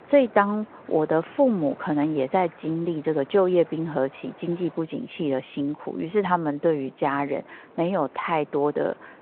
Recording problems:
phone-call audio
wind in the background; faint; throughout; 25 dB below the speech

